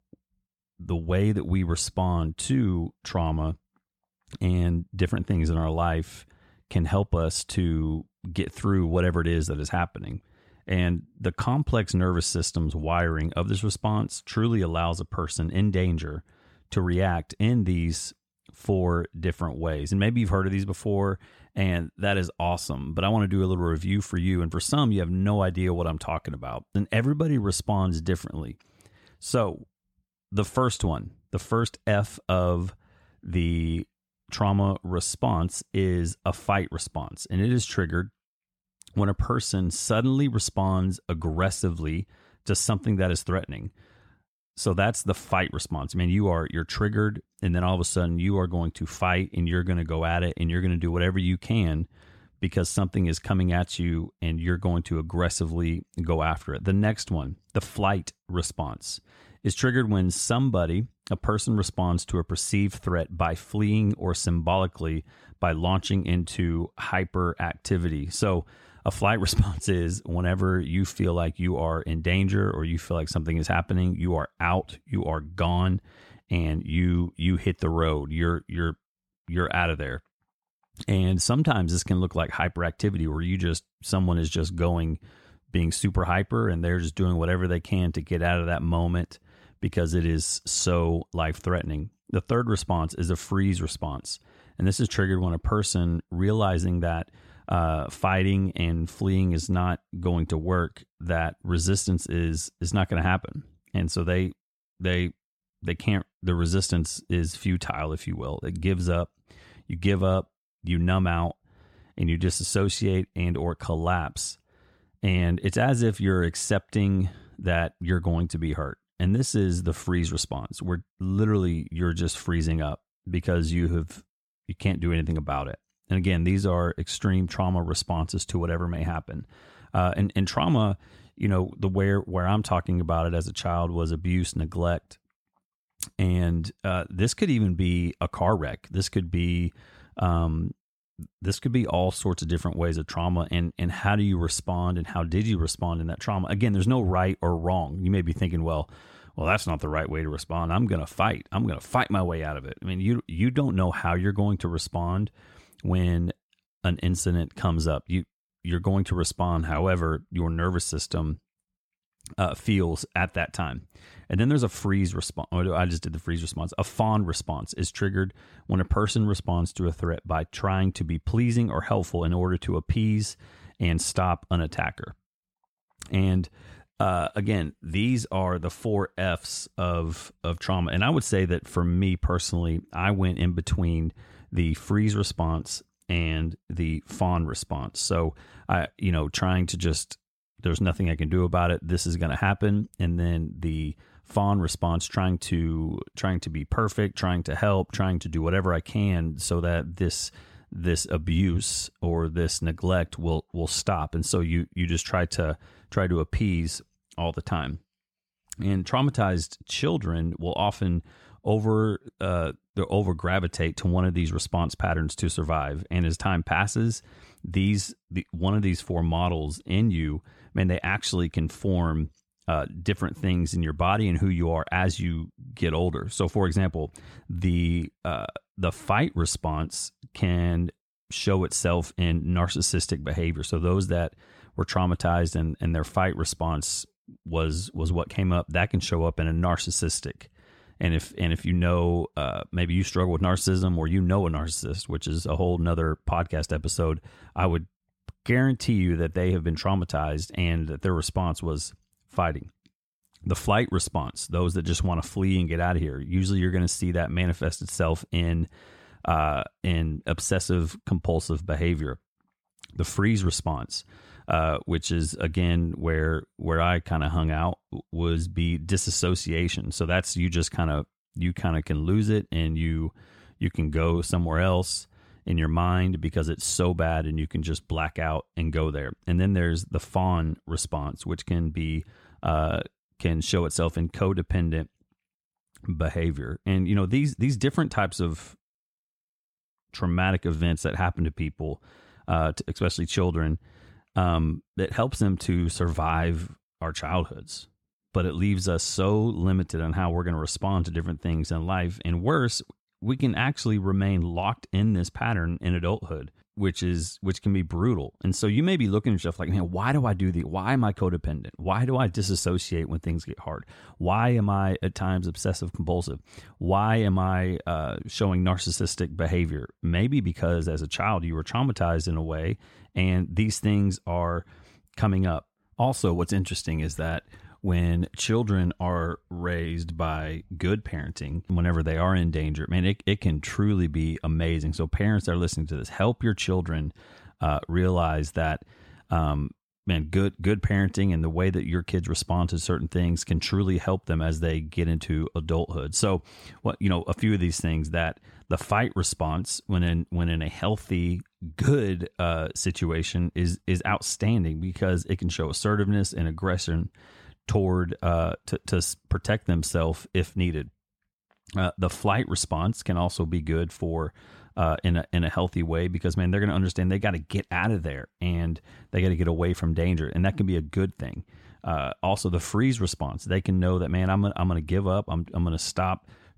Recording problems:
none

